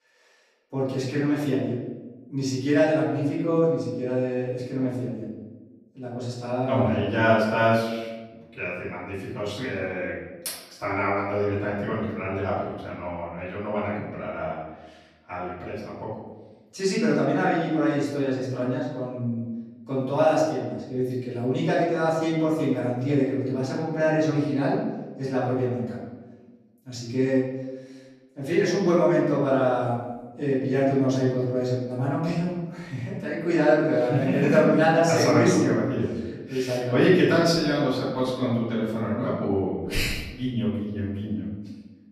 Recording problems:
off-mic speech; far
room echo; noticeable; dies away in 1.1 s

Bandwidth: 14.5 kHz